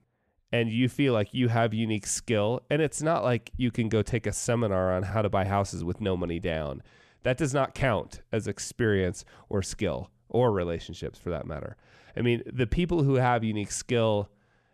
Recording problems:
none

